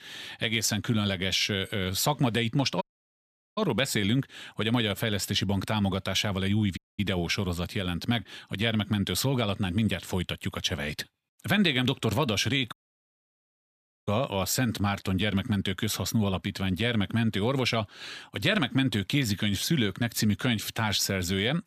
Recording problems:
audio cutting out; at 3 s for 1 s, at 7 s and at 13 s for 1.5 s

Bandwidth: 14.5 kHz